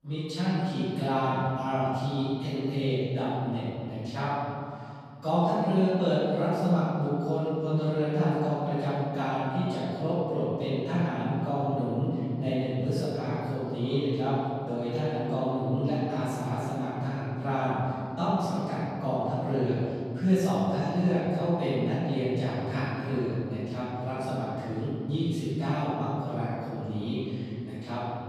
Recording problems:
room echo; strong; dies away in 2.5 s
off-mic speech; far

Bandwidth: 14.5 kHz